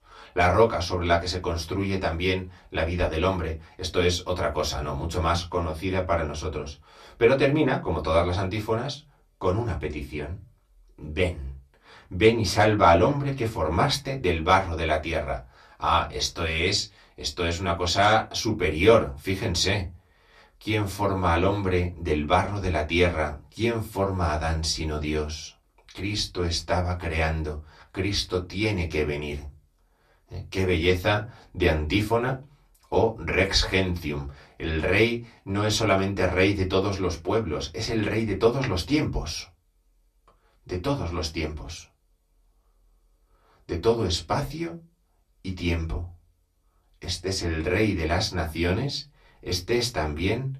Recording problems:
off-mic speech; far
room echo; very slight; dies away in 0.2 s

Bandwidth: 14.5 kHz